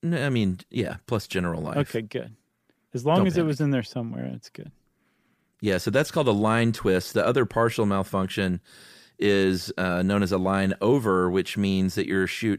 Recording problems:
none

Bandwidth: 15 kHz